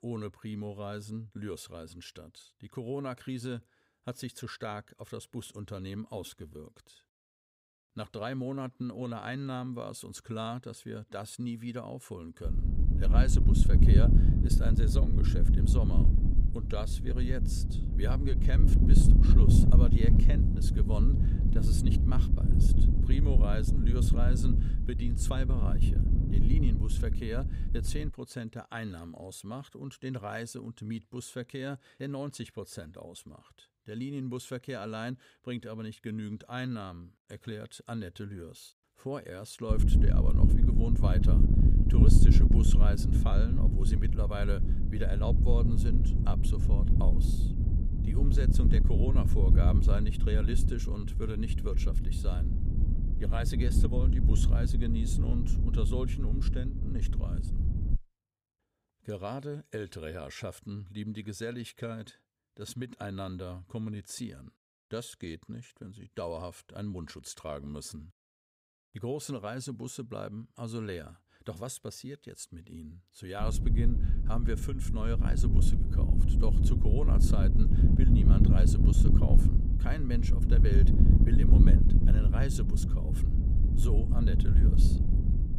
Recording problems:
wind noise on the microphone; heavy; from 12 to 28 s, from 40 to 58 s and from 1:13 on; as loud as the speech

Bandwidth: 15.5 kHz